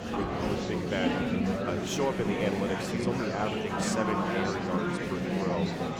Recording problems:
murmuring crowd; very loud; throughout; 4 dB above the speech
rain or running water; noticeable; until 3 s; 10 dB below the speech

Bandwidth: 18.5 kHz